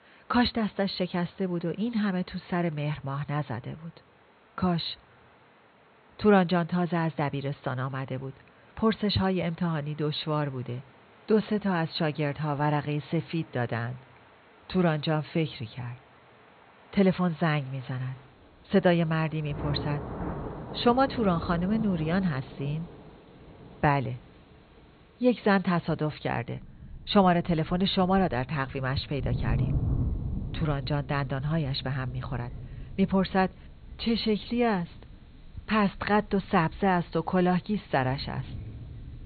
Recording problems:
high frequencies cut off; severe; nothing above 4.5 kHz
rain or running water; noticeable; throughout; 10 dB below the speech

